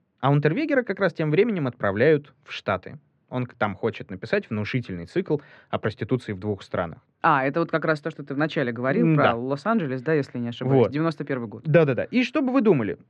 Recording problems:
muffled; very; fading above 2 kHz

